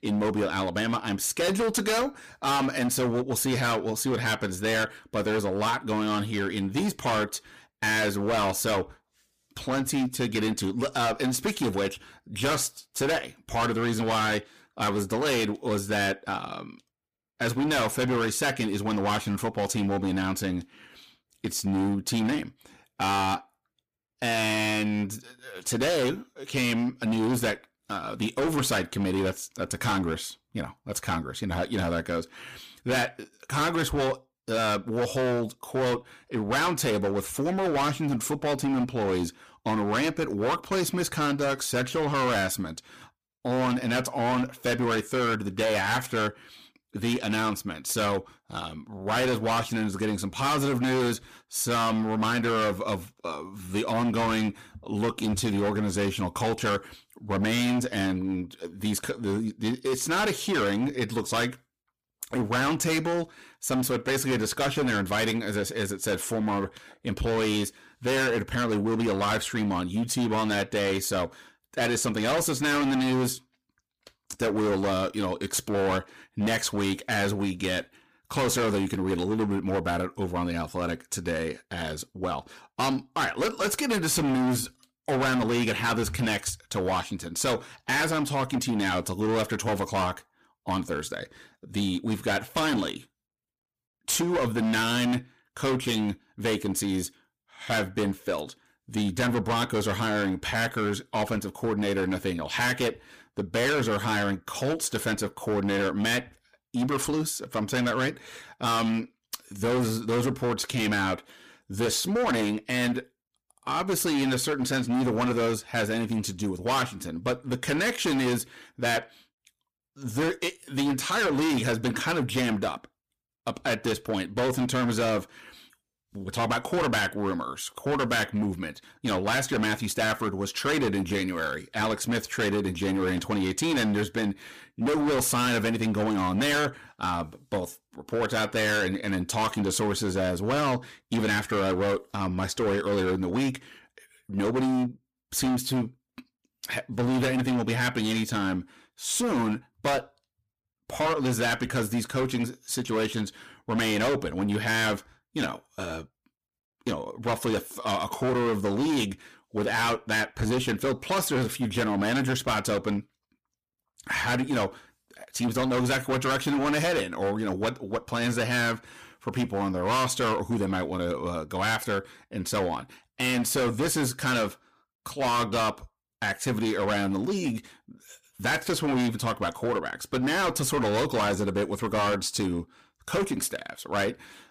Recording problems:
distortion; heavy; 18% of the sound clipped

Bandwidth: 15 kHz